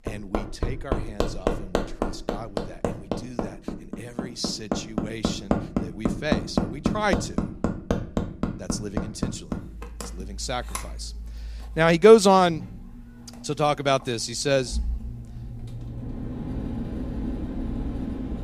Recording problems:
machinery noise; loud; throughout; 8 dB below the speech

